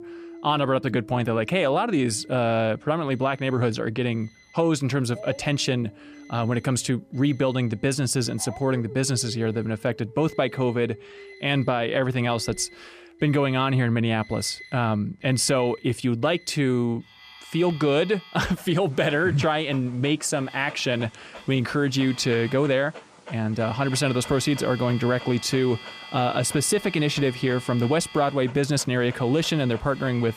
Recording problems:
alarms or sirens; noticeable; throughout; 20 dB below the speech
animal sounds; faint; throughout; 20 dB below the speech

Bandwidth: 14.5 kHz